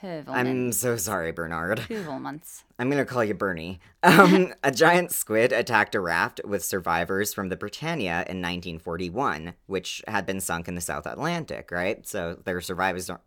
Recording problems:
none

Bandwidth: 18 kHz